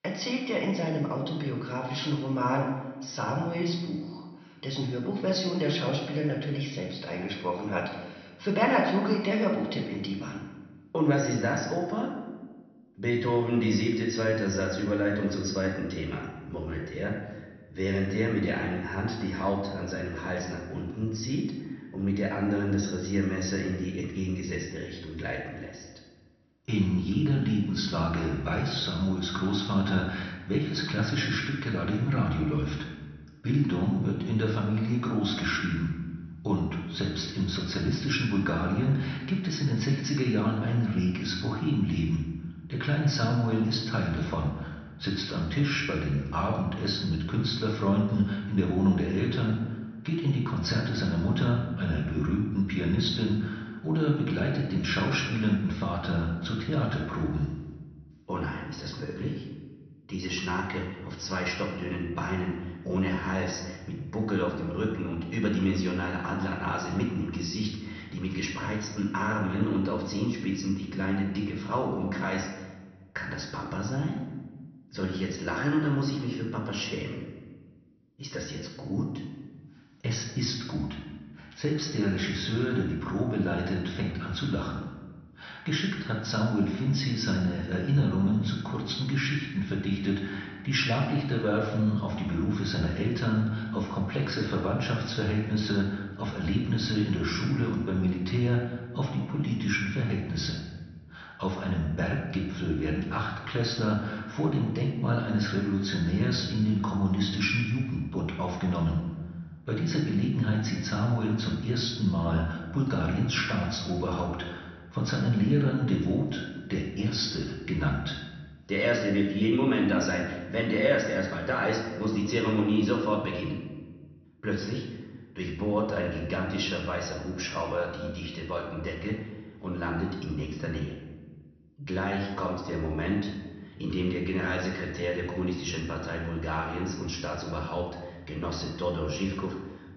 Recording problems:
off-mic speech; far
room echo; noticeable; dies away in 1 s
high frequencies cut off; noticeable; nothing above 6 kHz

